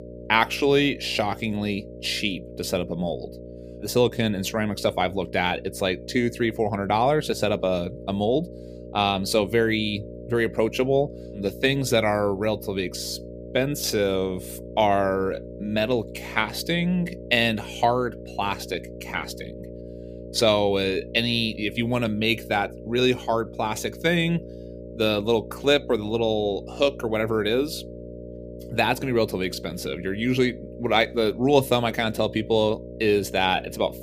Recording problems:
electrical hum; noticeable; throughout; 60 Hz, 15 dB below the speech

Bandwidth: 15 kHz